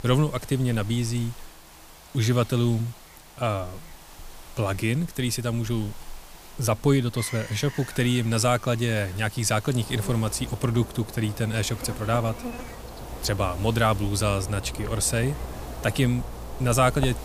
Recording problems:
animal sounds; noticeable; throughout; 15 dB below the speech
hiss; faint; throughout; 20 dB below the speech

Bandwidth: 15 kHz